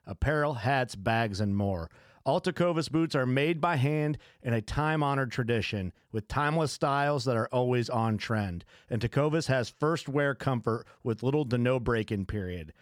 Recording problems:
none

